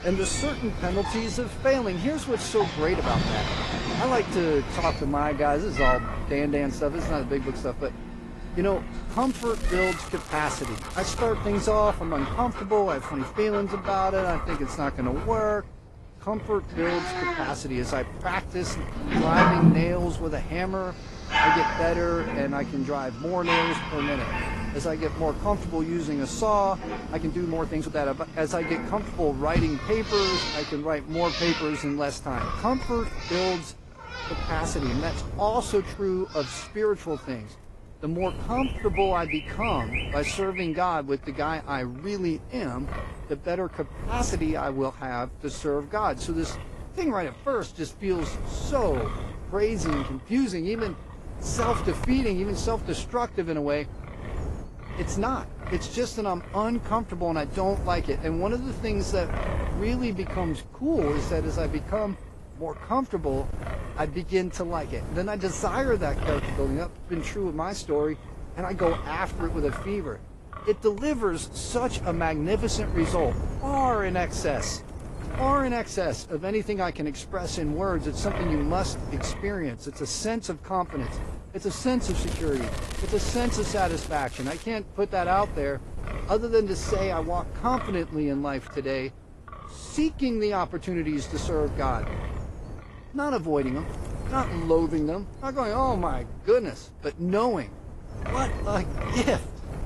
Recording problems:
garbled, watery; slightly; nothing above 11 kHz
animal sounds; loud; until 41 s; 3 dB below the speech
wind noise on the microphone; occasional gusts; 10 dB below the speech
crackling; noticeable; from 9 to 11 s and from 1:22 to 1:25; 15 dB below the speech
uneven, jittery; strongly; from 1 s to 1:30

